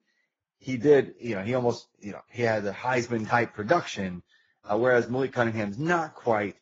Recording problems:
garbled, watery; badly

